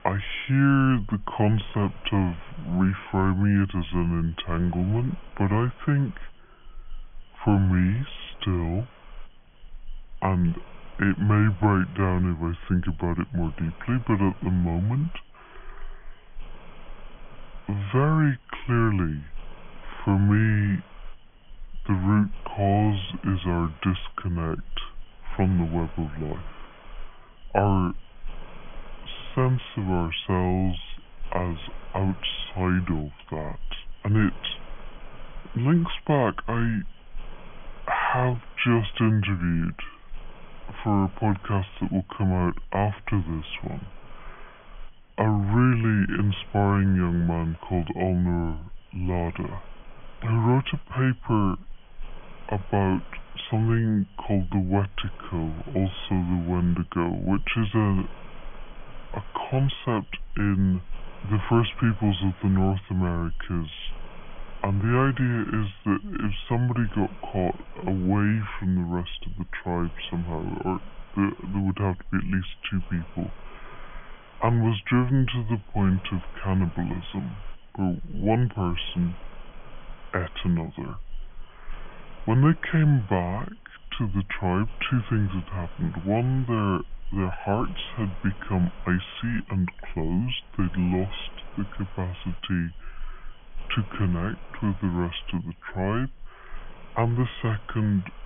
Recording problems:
high frequencies cut off; severe; nothing above 3.5 kHz
wrong speed and pitch; too slow and too low; 0.7 times normal speed
hiss; faint; throughout; 20 dB below the speech

